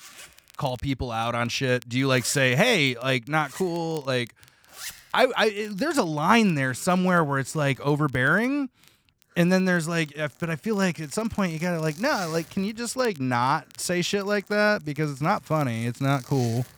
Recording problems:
household noises; noticeable; throughout; 20 dB below the speech
crackle, like an old record; faint; 30 dB below the speech

